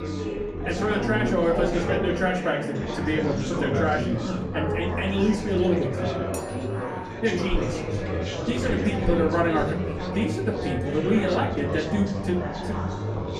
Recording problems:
off-mic speech; far
room echo; slight; dies away in 0.4 s
chatter from many people; loud; throughout; 2 dB below the speech
background music; faint; throughout; 20 dB below the speech
clattering dishes; faint; at 6.5 s; peak 15 dB below the speech

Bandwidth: 15 kHz